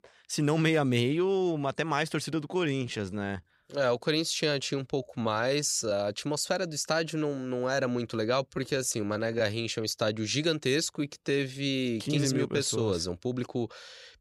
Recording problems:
uneven, jittery; strongly; from 2.5 to 12 s

